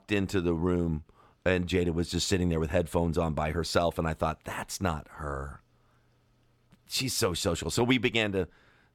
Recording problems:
none

